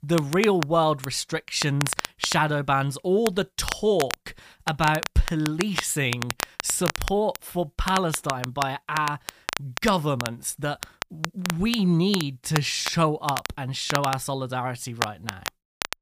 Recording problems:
crackle, like an old record; loud; 8 dB below the speech

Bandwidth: 15 kHz